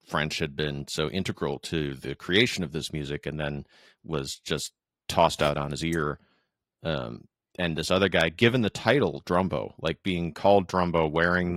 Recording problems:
garbled, watery; slightly; nothing above 16 kHz
abrupt cut into speech; at the end

